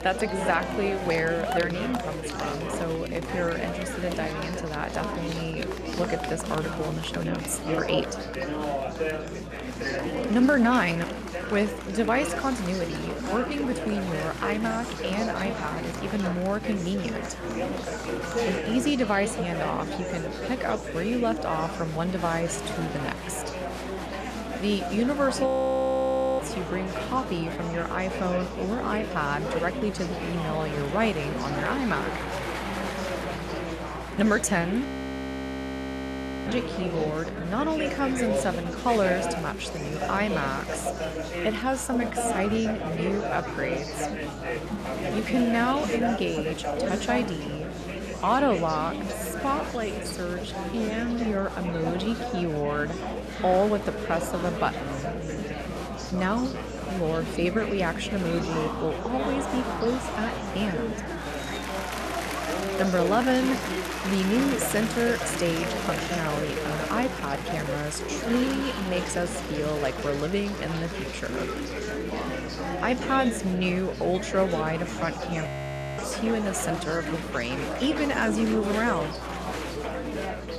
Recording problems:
murmuring crowd; loud; throughout; 3 dB below the speech
electrical hum; faint; throughout; 60 Hz, 25 dB below the speech
crackling; faint; from 39 to 42 s and from 45 to 47 s; 30 dB below the speech
audio freezing; at 25 s for 1 s, at 35 s for 1.5 s and at 1:15 for 0.5 s

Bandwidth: 13.5 kHz